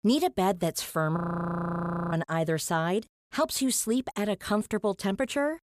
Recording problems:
audio freezing; at 1 s for 1 s

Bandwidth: 14.5 kHz